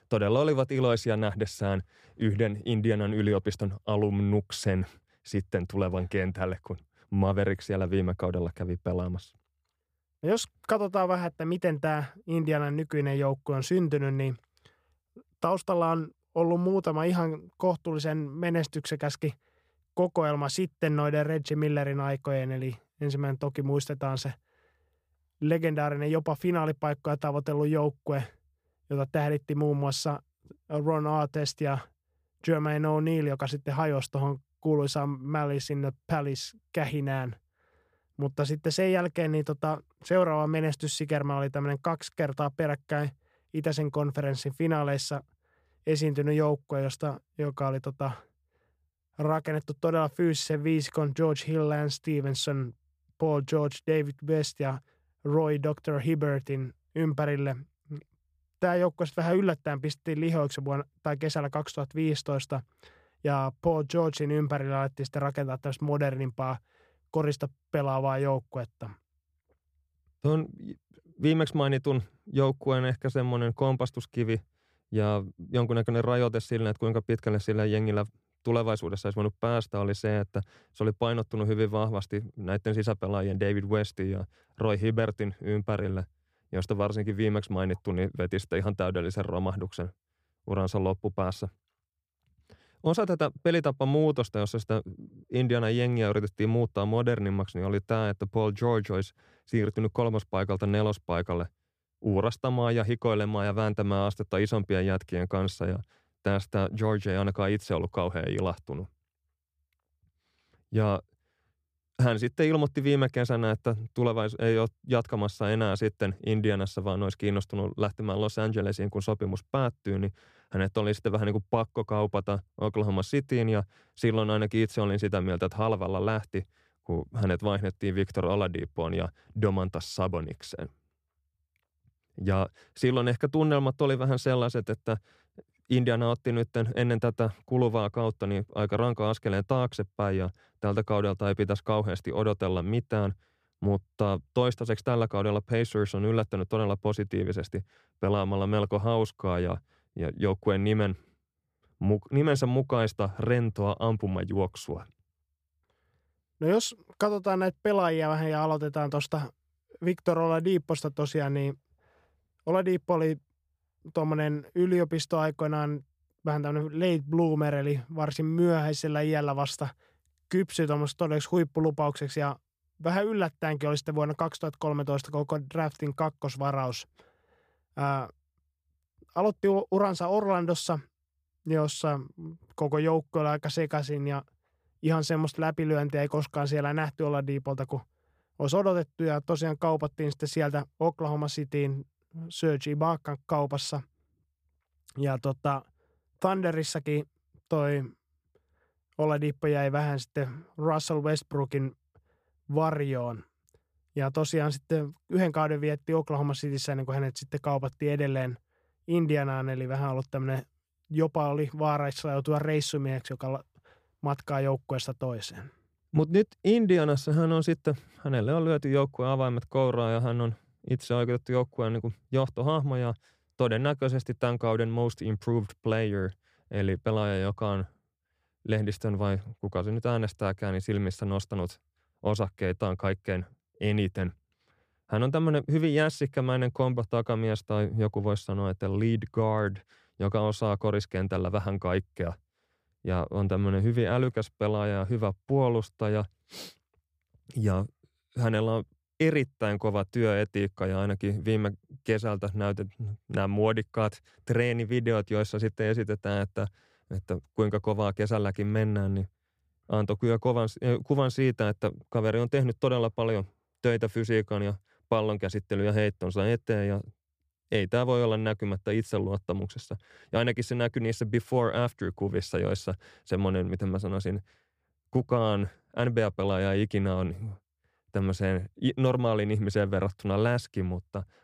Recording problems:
none

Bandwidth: 15 kHz